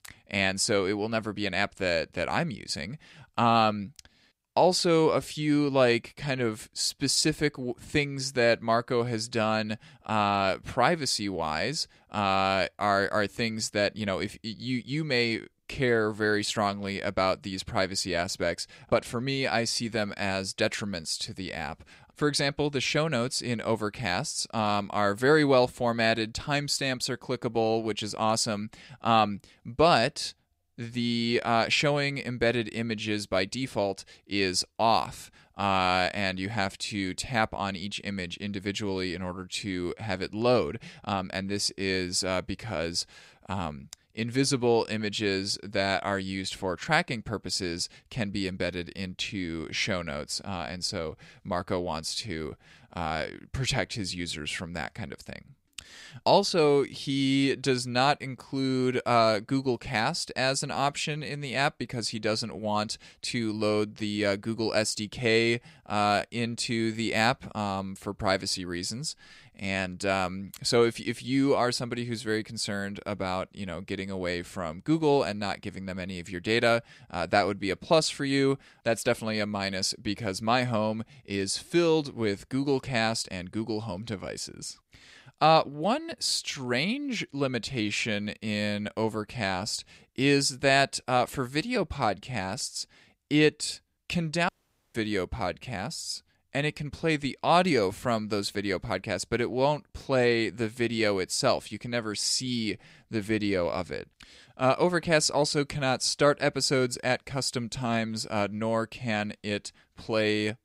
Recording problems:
audio cutting out; at 1:34

